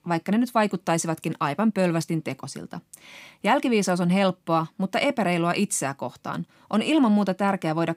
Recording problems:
none

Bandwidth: 15.5 kHz